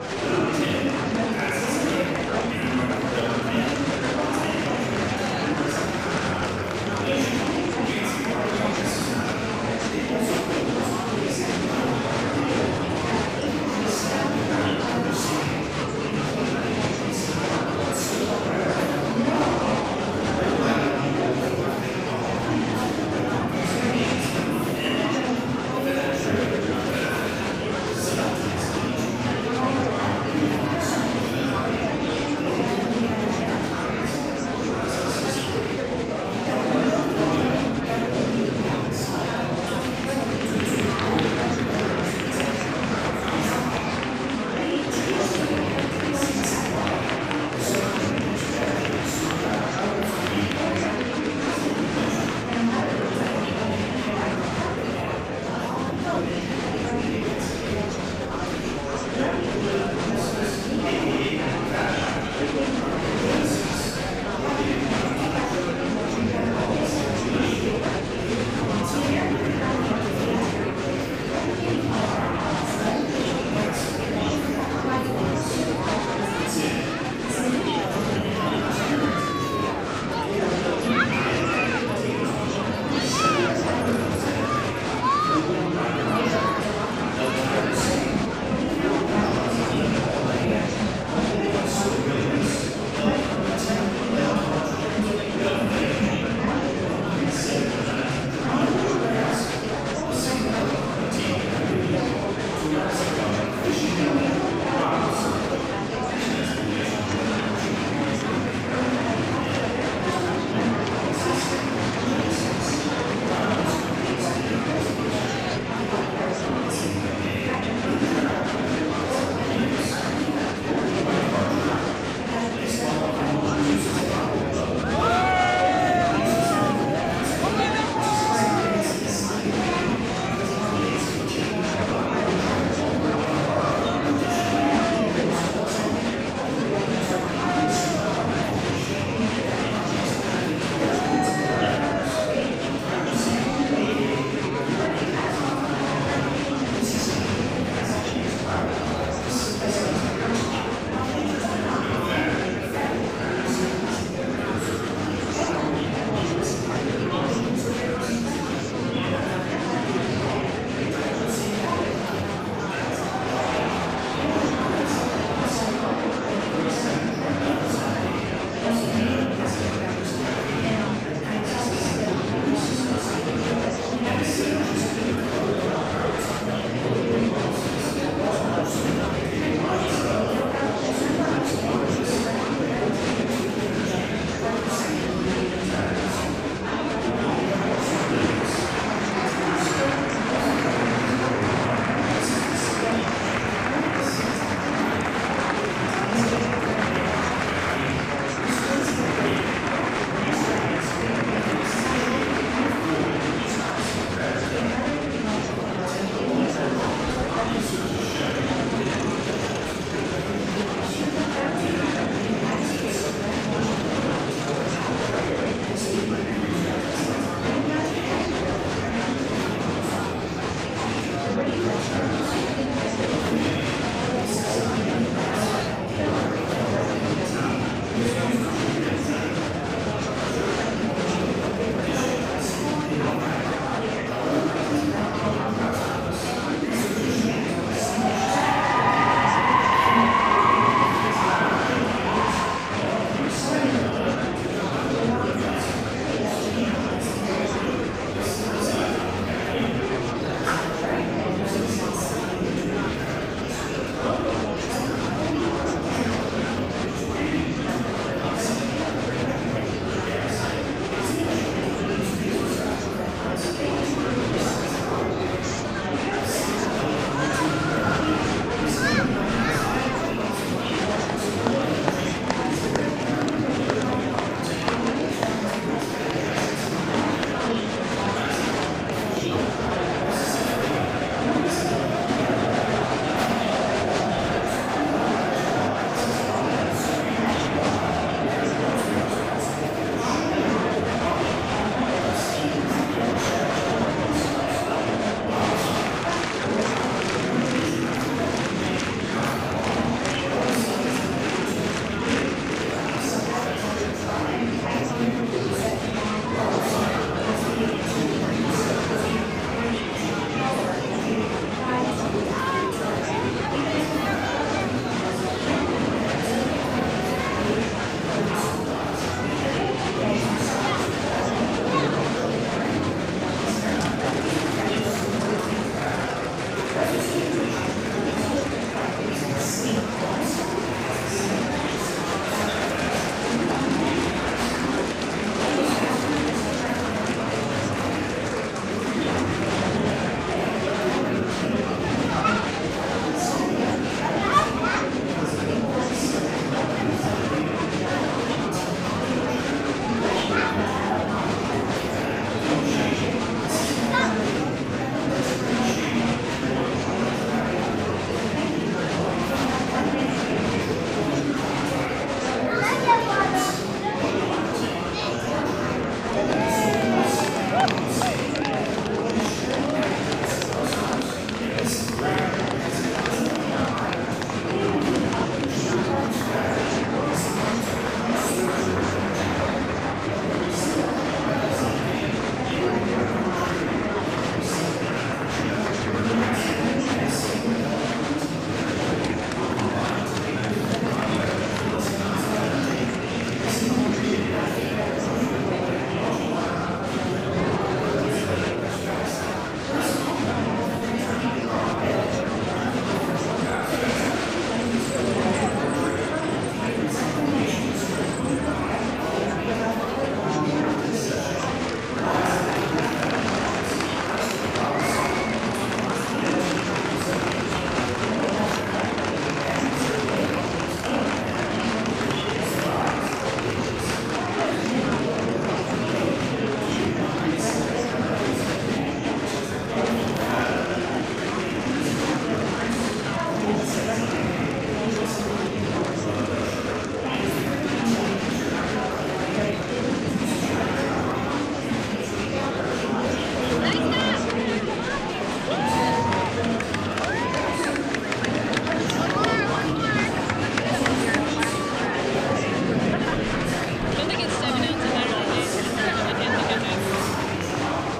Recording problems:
room echo; strong; dies away in 2.8 s
off-mic speech; far
murmuring crowd; very loud; throughout; 4 dB above the speech

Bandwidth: 15.5 kHz